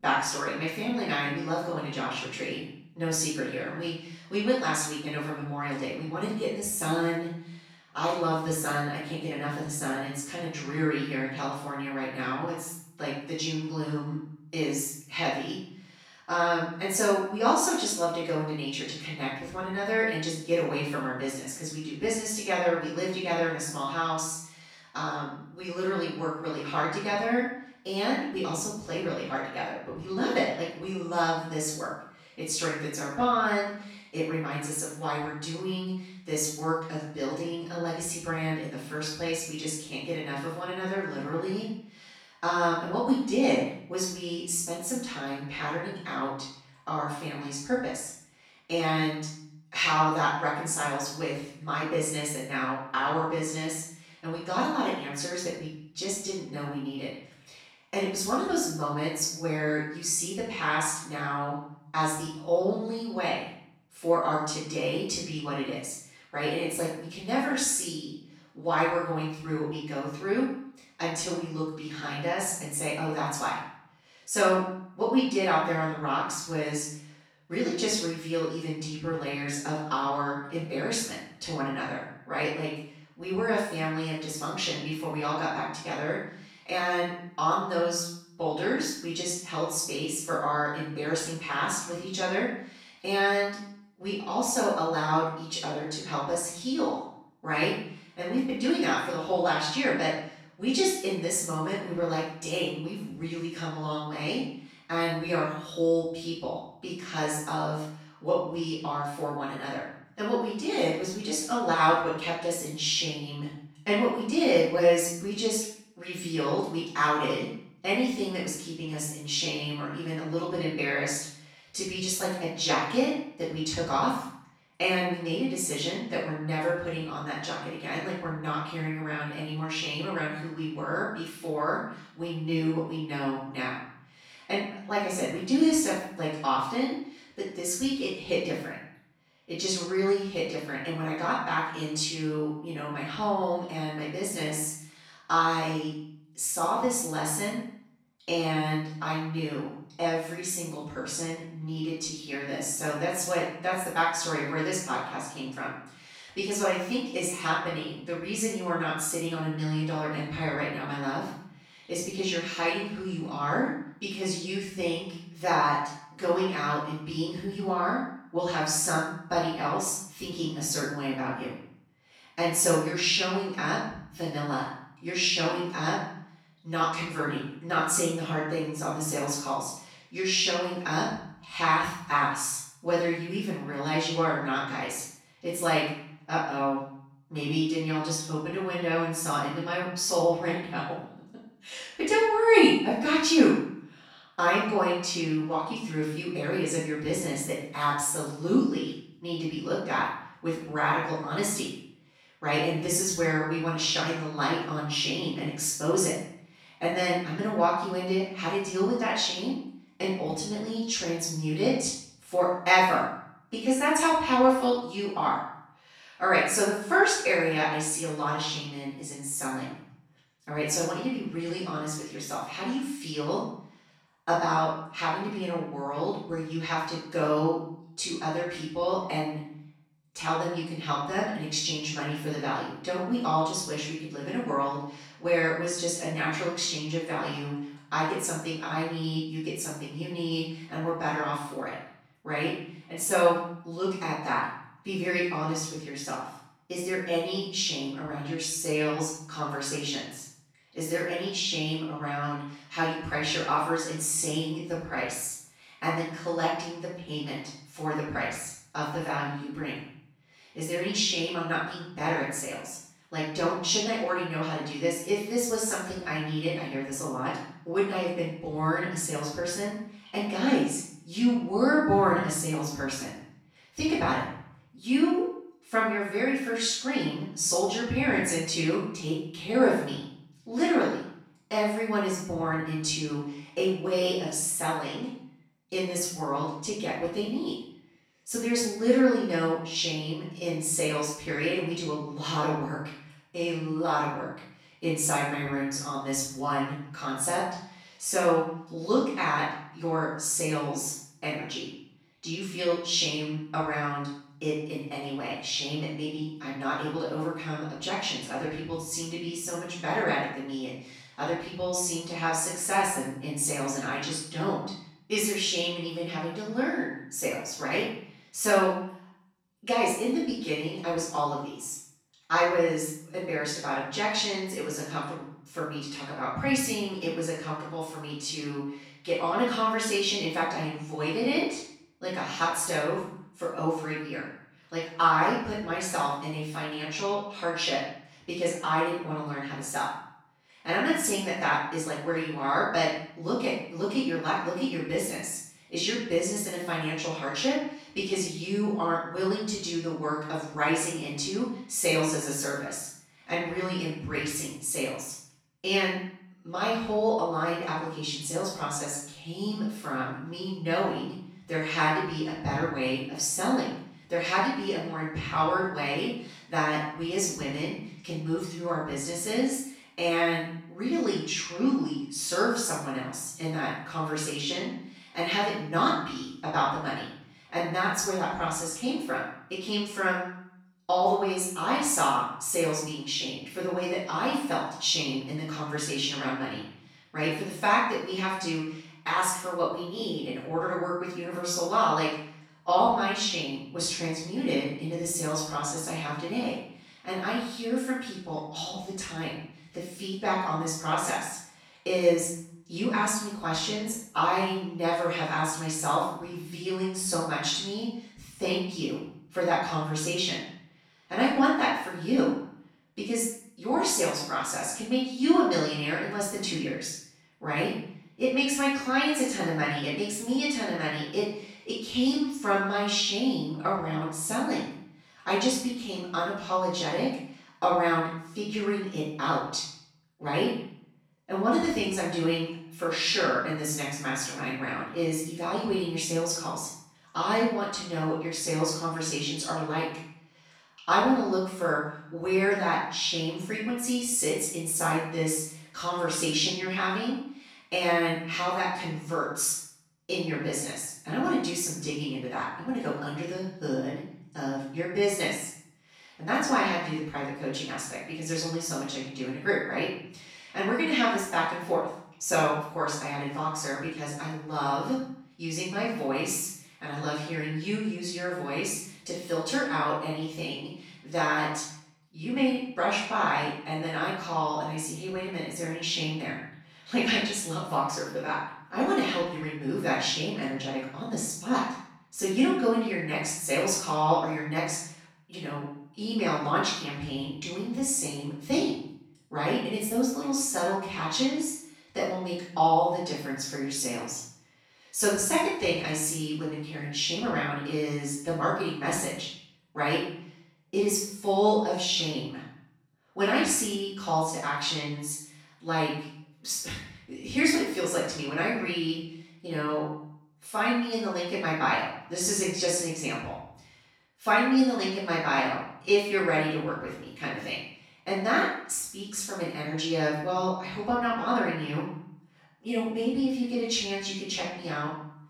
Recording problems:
off-mic speech; far
room echo; noticeable; dies away in 0.6 s

